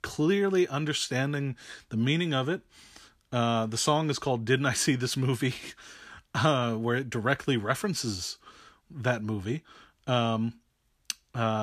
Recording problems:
abrupt cut into speech; at the end

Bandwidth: 14.5 kHz